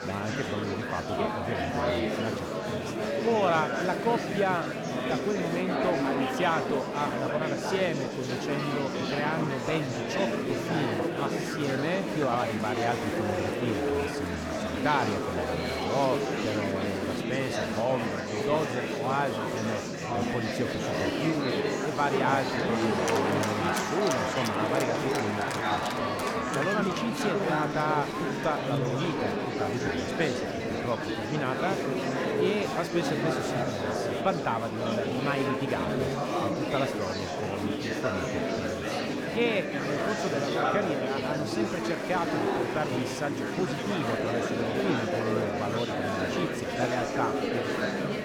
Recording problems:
murmuring crowd; very loud; throughout; 2 dB above the speech

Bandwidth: 18 kHz